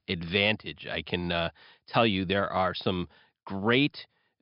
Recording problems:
high frequencies cut off; noticeable; nothing above 5.5 kHz

